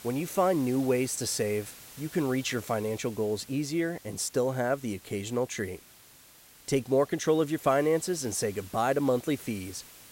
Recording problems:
hiss; noticeable; throughout; 20 dB below the speech

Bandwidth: 16 kHz